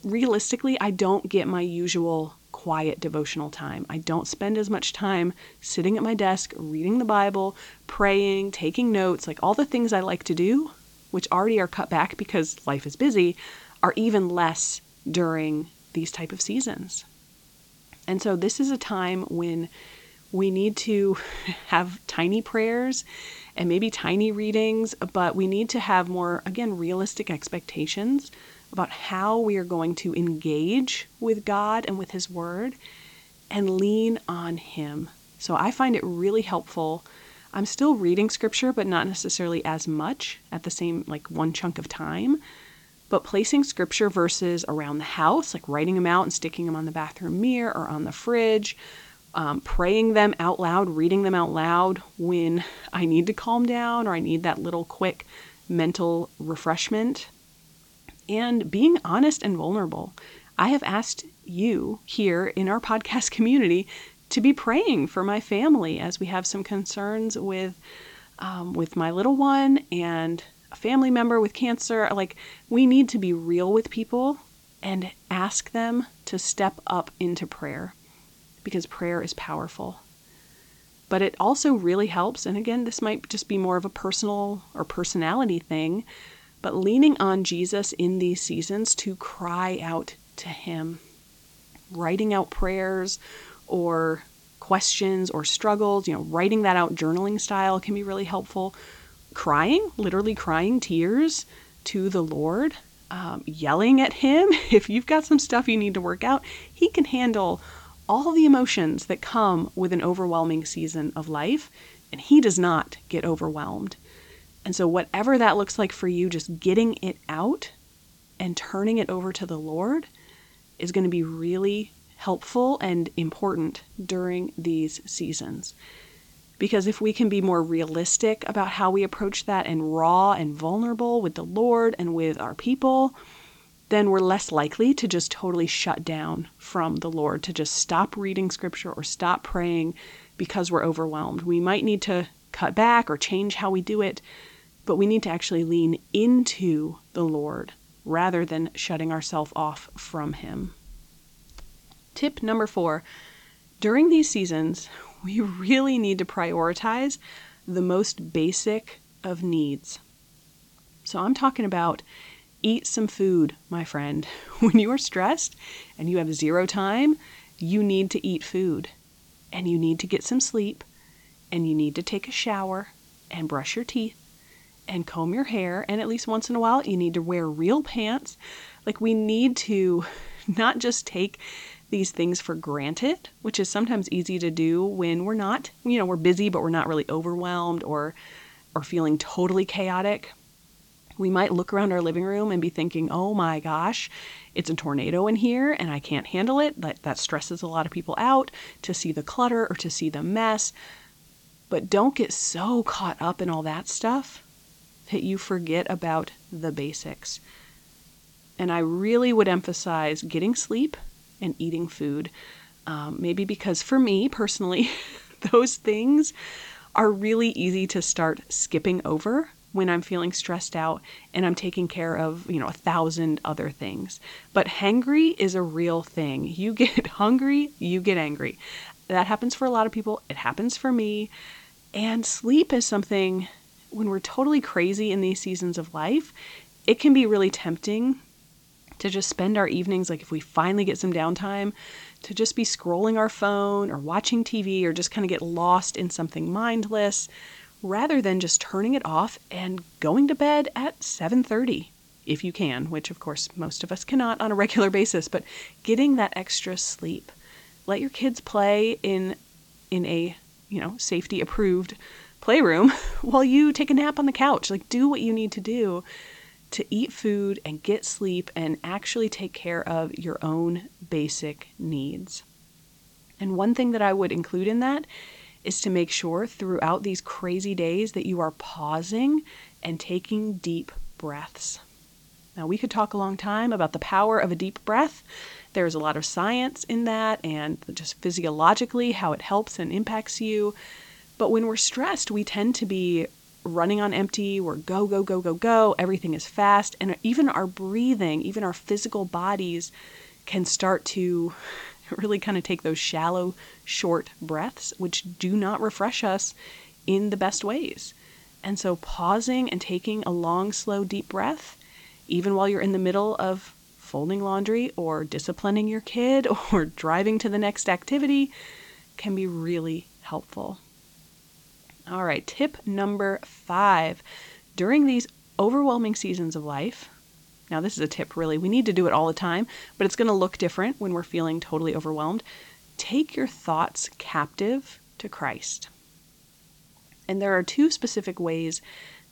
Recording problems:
high frequencies cut off; noticeable; nothing above 8 kHz
hiss; faint; throughout; 30 dB below the speech

